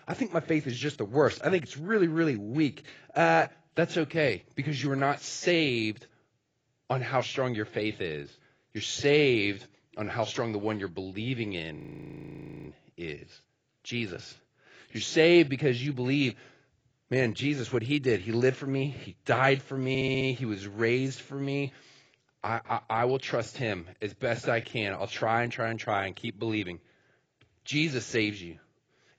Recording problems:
garbled, watery; badly; nothing above 7.5 kHz
audio freezing; at 12 s for 1 s
audio stuttering; at 20 s

